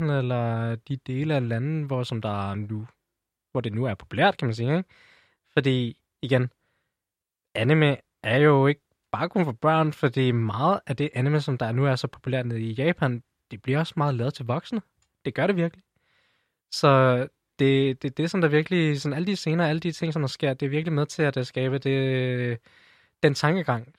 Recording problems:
abrupt cut into speech; at the start

